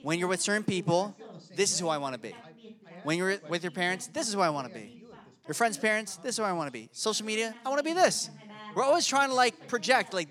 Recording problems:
background chatter; faint; throughout; 2 voices, 20 dB below the speech

